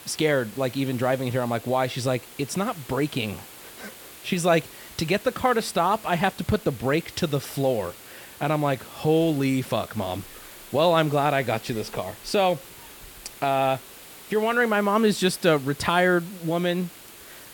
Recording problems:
hiss; noticeable; throughout; 20 dB below the speech

